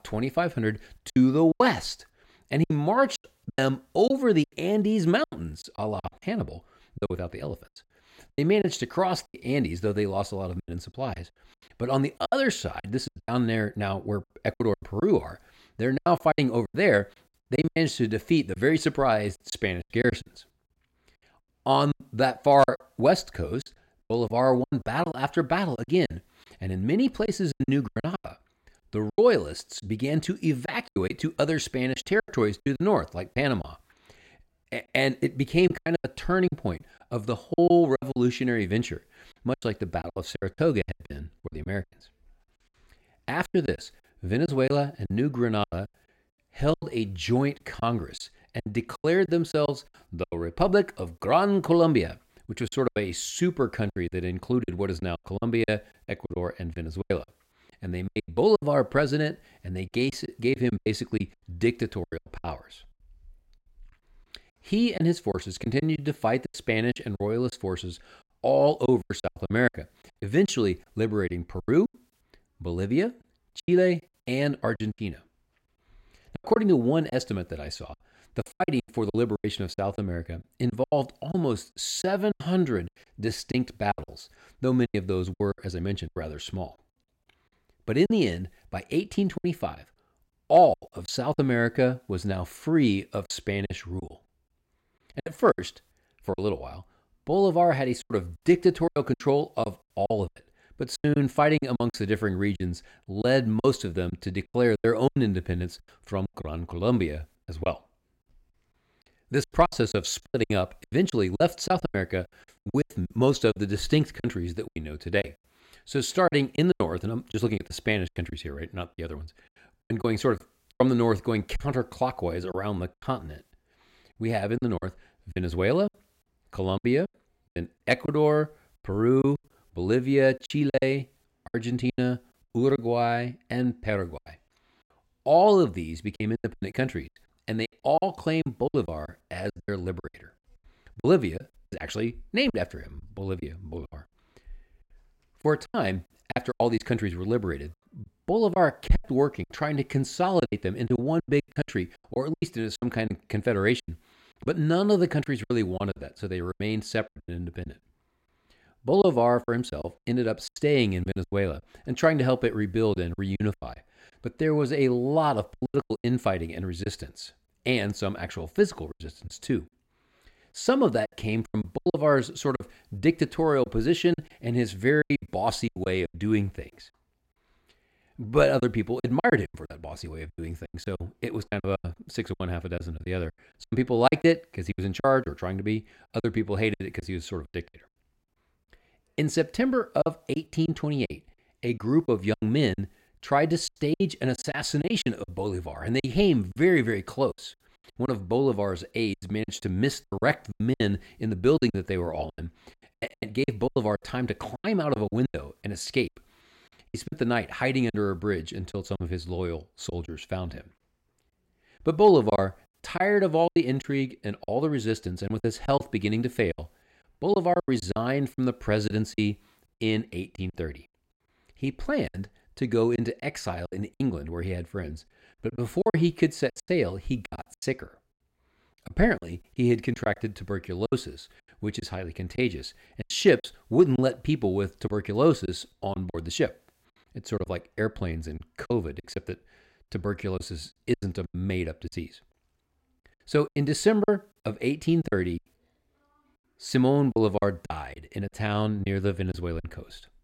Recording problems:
choppy; very; 12% of the speech affected

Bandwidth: 16 kHz